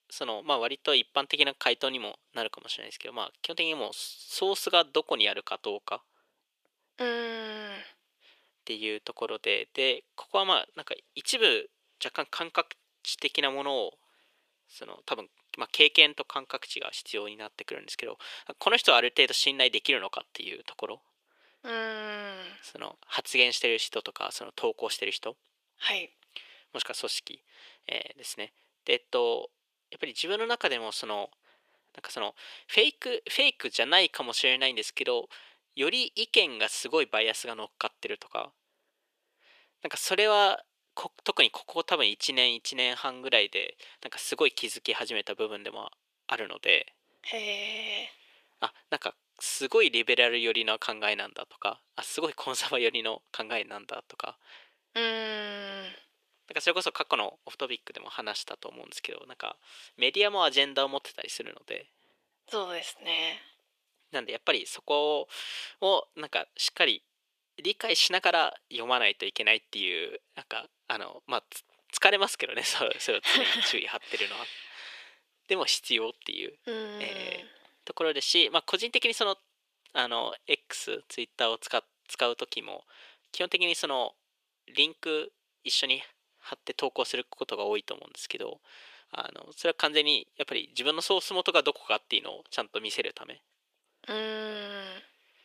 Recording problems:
thin; very; fading below 450 Hz

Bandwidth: 14.5 kHz